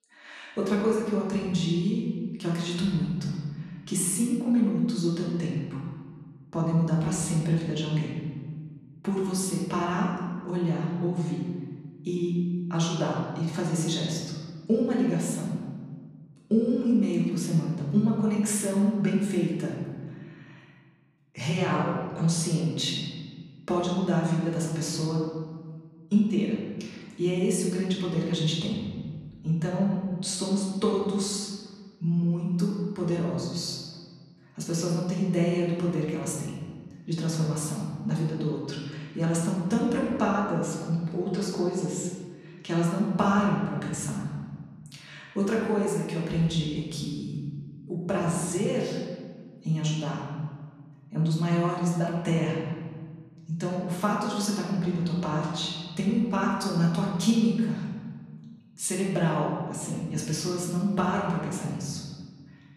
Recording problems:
off-mic speech; far
room echo; noticeable; dies away in 1.5 s

